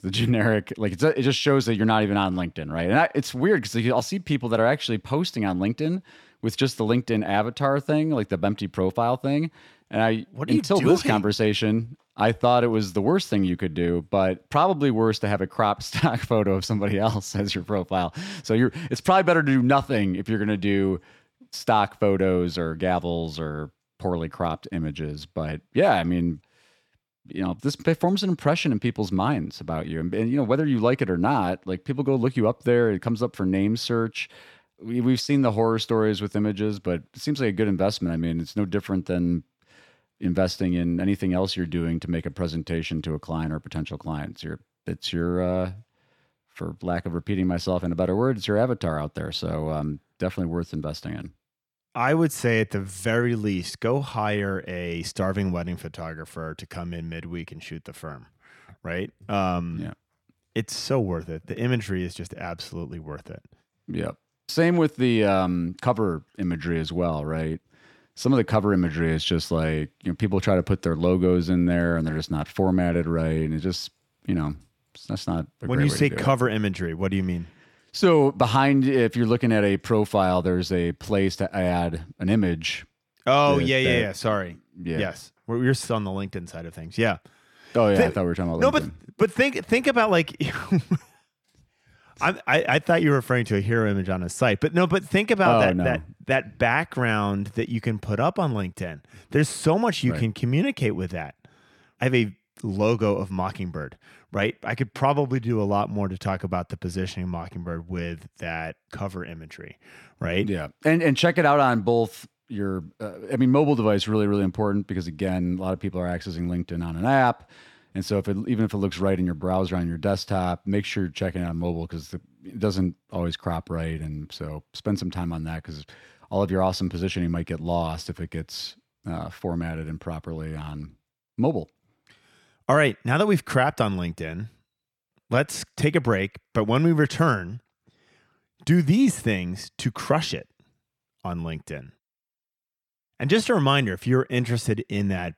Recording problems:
none

